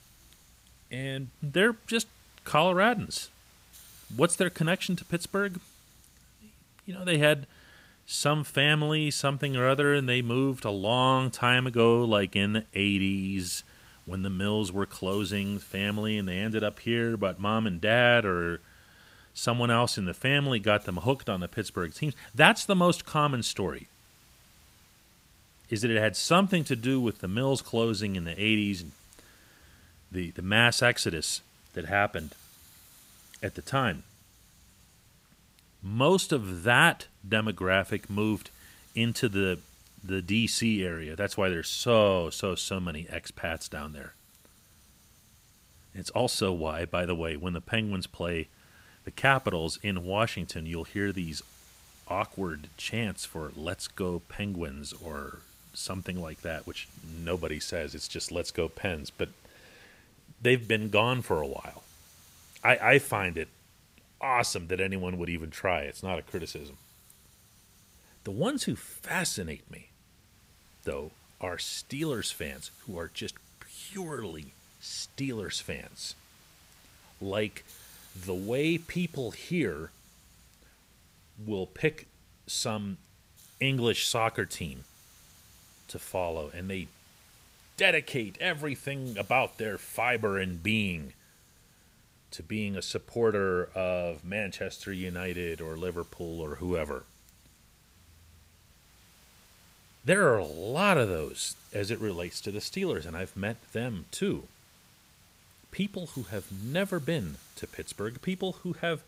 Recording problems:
hiss; faint; throughout; 25 dB below the speech

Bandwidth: 15.5 kHz